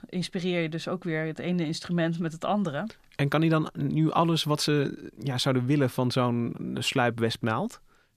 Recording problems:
none

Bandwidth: 14.5 kHz